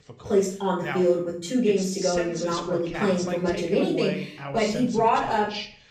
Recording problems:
off-mic speech; far
room echo; noticeable; dies away in 0.4 s
voice in the background; loud; throughout; 10 dB below the speech

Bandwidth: 15 kHz